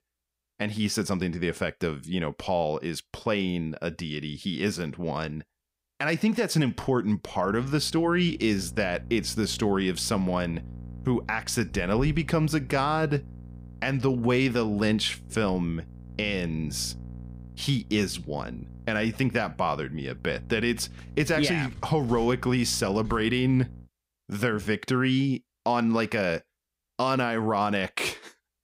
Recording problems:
electrical hum; faint; from 7.5 to 24 s; 60 Hz, 25 dB below the speech

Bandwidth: 15.5 kHz